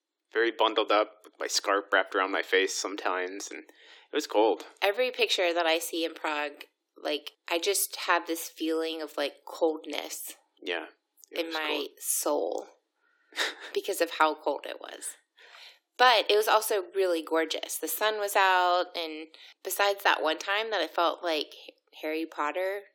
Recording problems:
thin; very; fading below 300 Hz

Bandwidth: 17 kHz